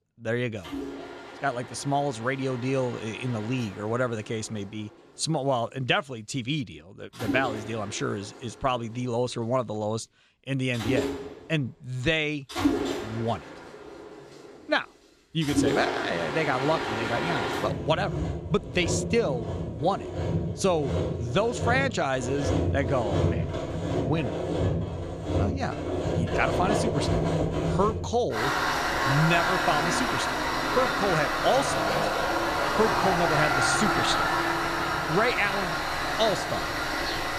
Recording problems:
machinery noise; very loud; throughout; 1 dB above the speech

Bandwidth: 14.5 kHz